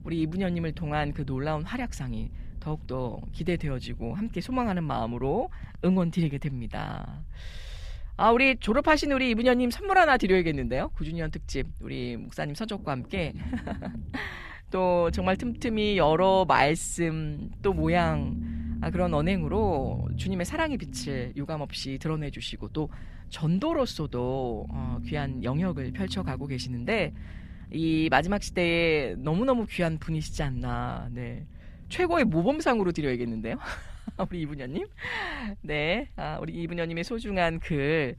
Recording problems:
low rumble; faint; throughout; 20 dB below the speech

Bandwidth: 14.5 kHz